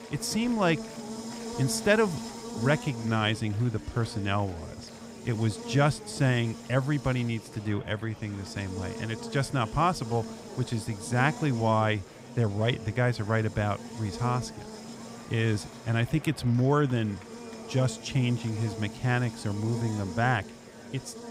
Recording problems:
electrical hum; noticeable; throughout; 60 Hz, 15 dB below the speech
murmuring crowd; noticeable; throughout; 20 dB below the speech

